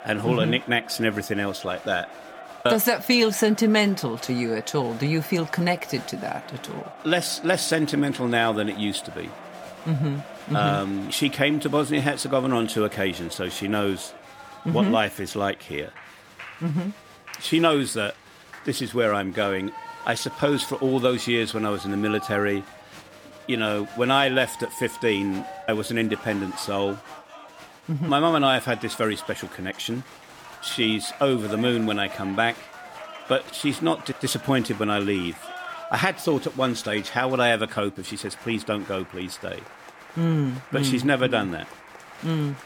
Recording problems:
crowd noise; noticeable; throughout; 15 dB below the speech

